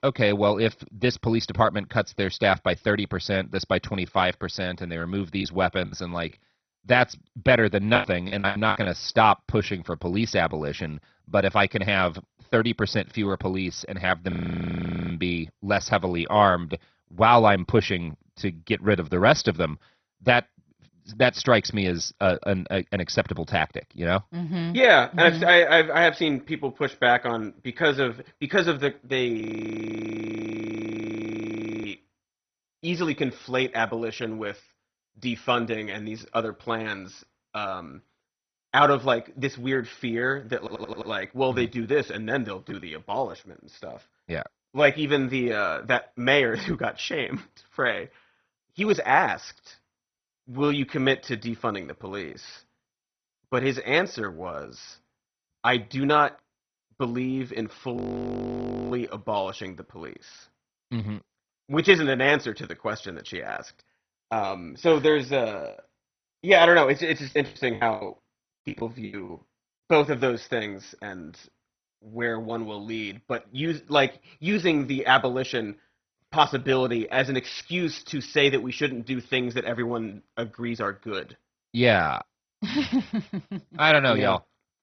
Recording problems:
garbled, watery; badly; nothing above 6 kHz
choppy; very; from 5.5 to 9 s and from 1:06 to 1:09; 17% of the speech affected
audio freezing; at 14 s for 1 s, at 29 s for 2.5 s and at 58 s for 1 s
audio stuttering; at 41 s

